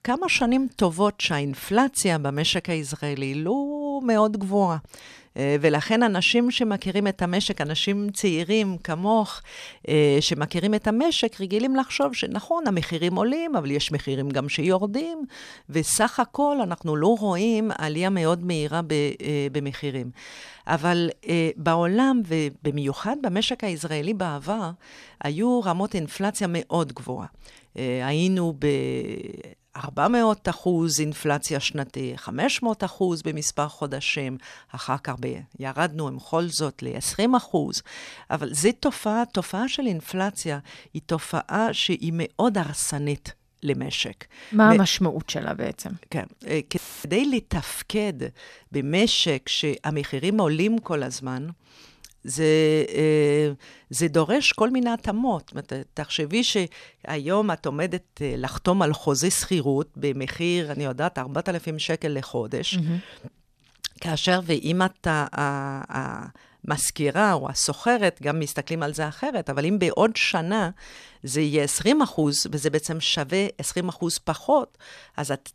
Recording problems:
audio cutting out; filled with static; at 47 s

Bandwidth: 14 kHz